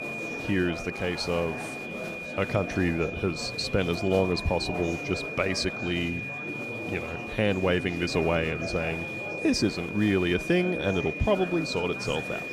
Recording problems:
high-pitched whine; loud; throughout; 2.5 kHz, 7 dB below the speech
murmuring crowd; loud; throughout; 10 dB below the speech

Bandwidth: 15 kHz